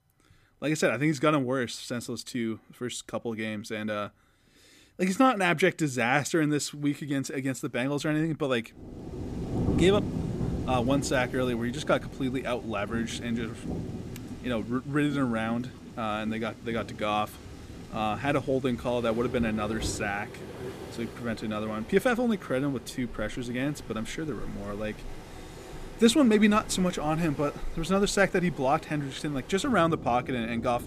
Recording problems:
rain or running water; noticeable; from 9 s on; 10 dB below the speech

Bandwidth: 15 kHz